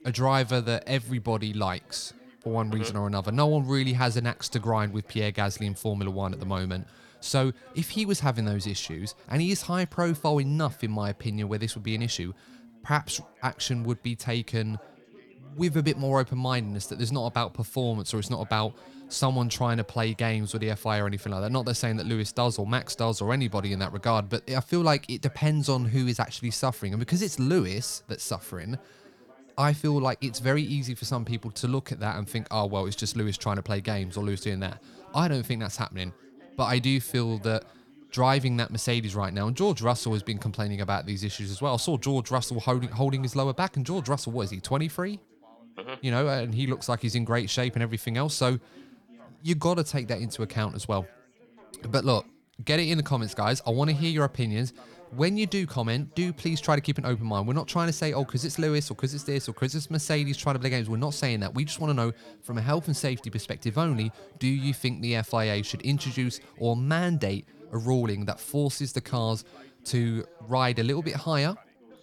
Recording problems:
background chatter; faint; throughout; 4 voices, 25 dB below the speech

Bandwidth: 18.5 kHz